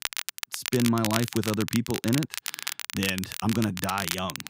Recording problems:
crackle, like an old record; loud; 4 dB below the speech

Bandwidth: 15.5 kHz